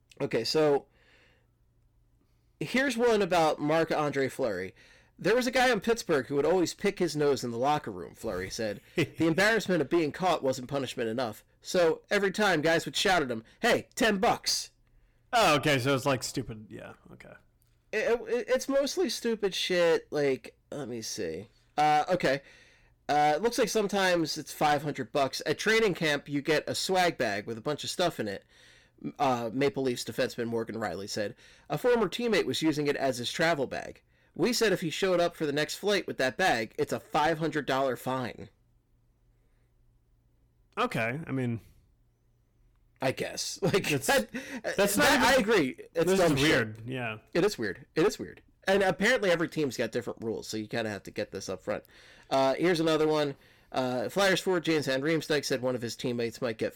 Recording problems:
distortion; heavy; 8% of the sound clipped

